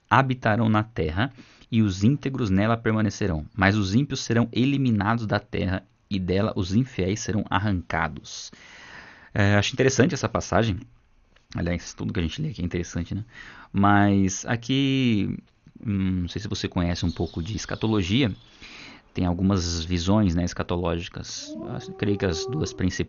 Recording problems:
garbled, watery; slightly; nothing above 6.5 kHz
animal sounds; noticeable; from 17 s on; 15 dB below the speech

